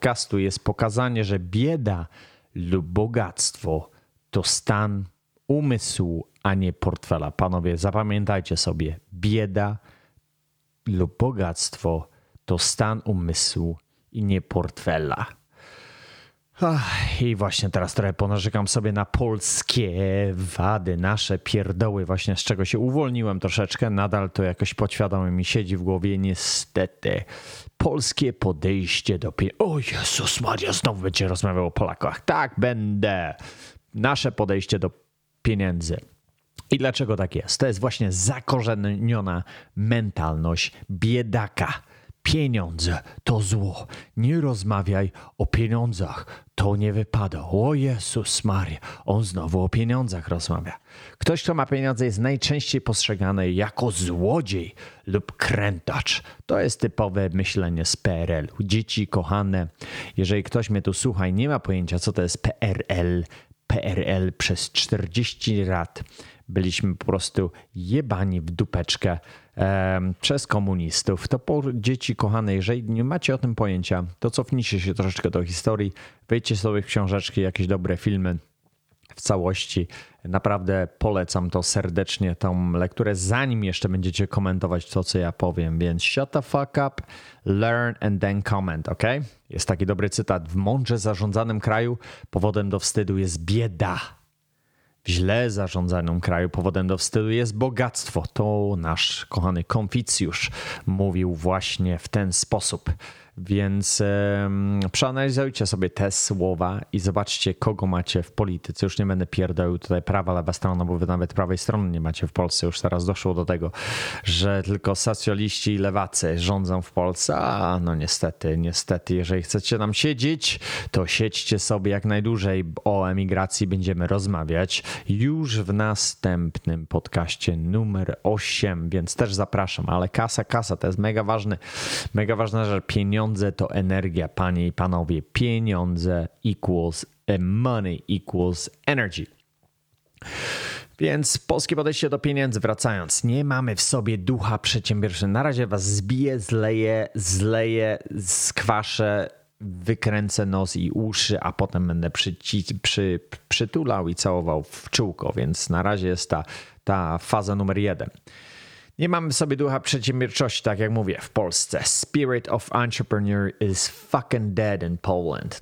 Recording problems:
squashed, flat; somewhat

